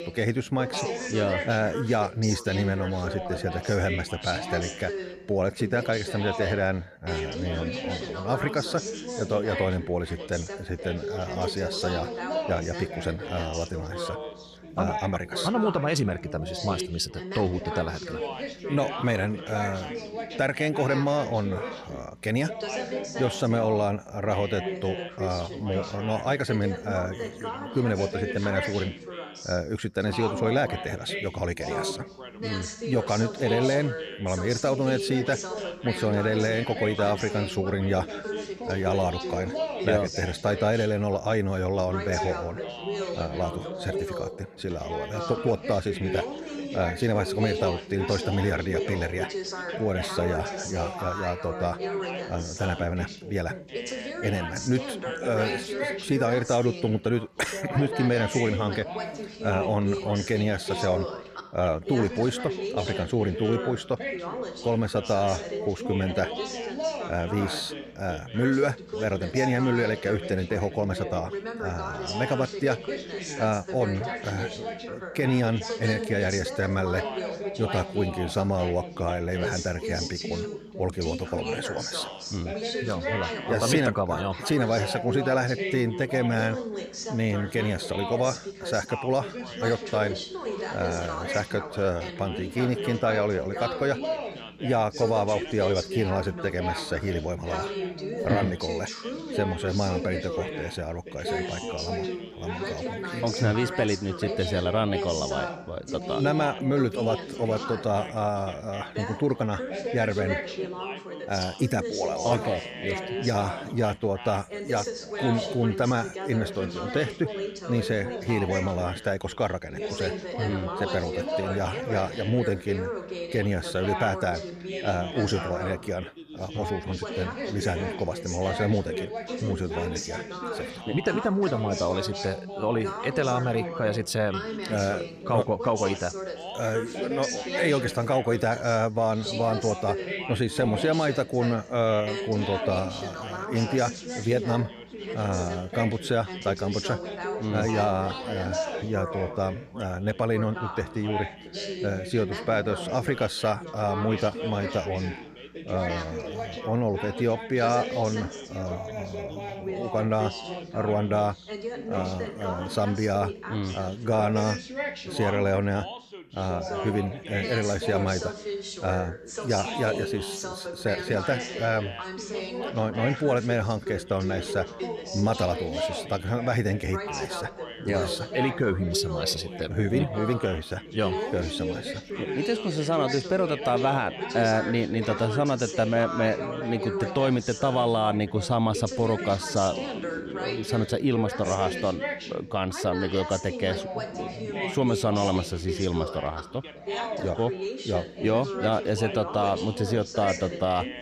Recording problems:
background chatter; loud; throughout; 3 voices, 6 dB below the speech

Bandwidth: 15 kHz